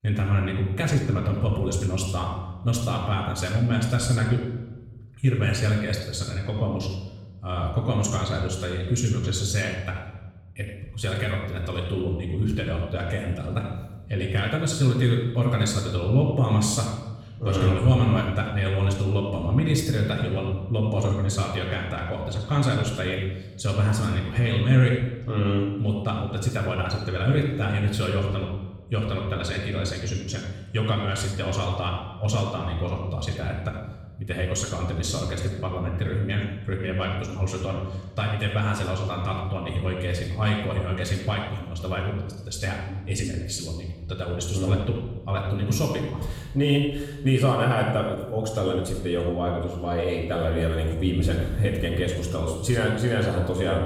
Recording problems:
off-mic speech; far
room echo; noticeable; dies away in 0.9 s

